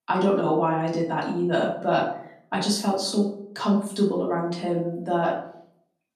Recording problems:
off-mic speech; far
room echo; slight; dies away in 0.5 s

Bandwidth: 13.5 kHz